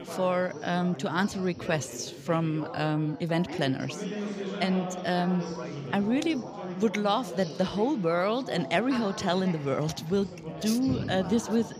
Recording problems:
chatter from many people; loud; throughout; 9 dB below the speech

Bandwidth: 15.5 kHz